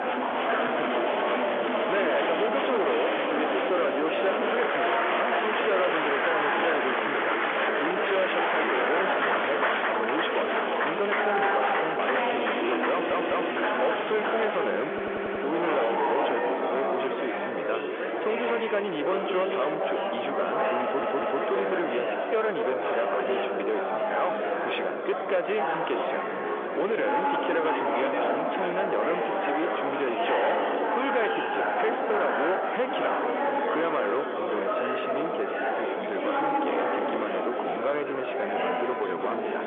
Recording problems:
phone-call audio; nothing above 3.5 kHz
distortion; slight; 10 dB below the speech
murmuring crowd; very loud; throughout; 3 dB above the speech
audio stuttering; at 13 s, at 15 s and at 21 s

